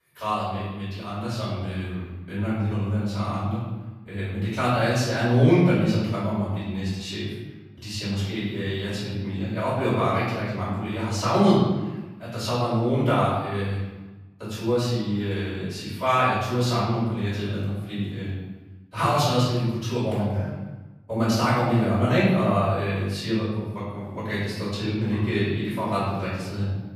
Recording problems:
room echo; strong; dies away in 1.1 s
off-mic speech; far

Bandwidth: 14.5 kHz